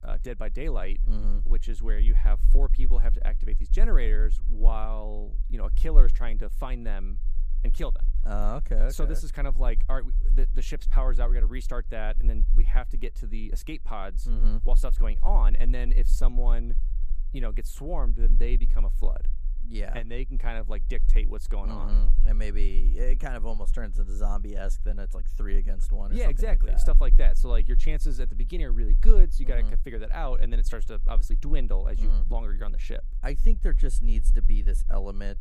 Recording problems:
low rumble; noticeable; throughout; 15 dB below the speech

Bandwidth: 14.5 kHz